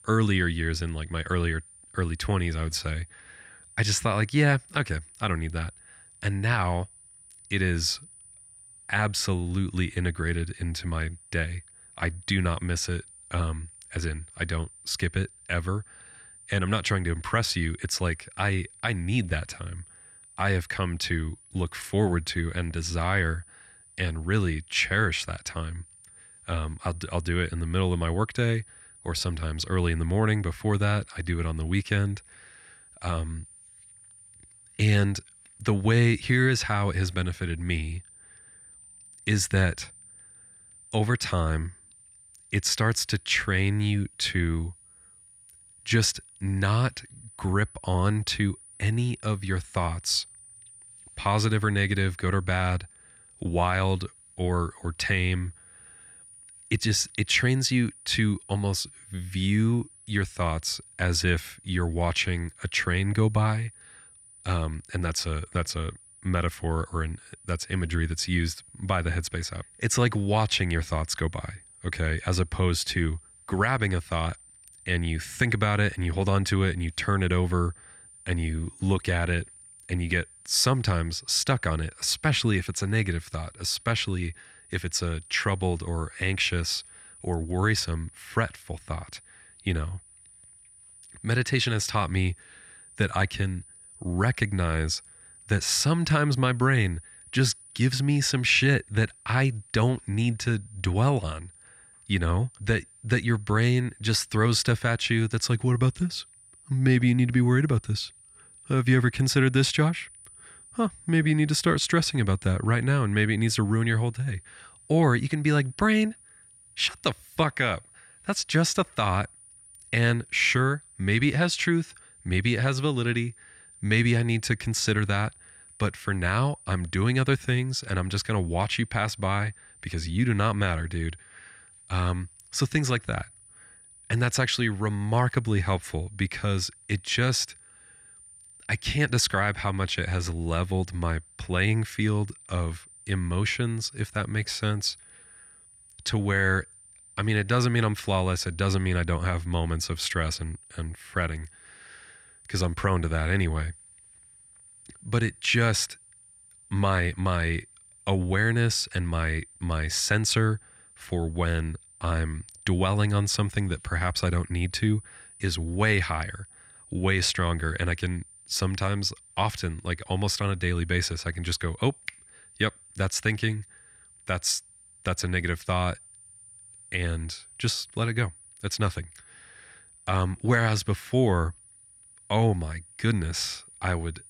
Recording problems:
high-pitched whine; faint; throughout; 9.5 kHz, 25 dB below the speech

